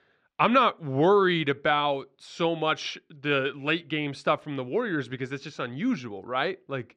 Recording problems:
muffled; slightly; fading above 3 kHz

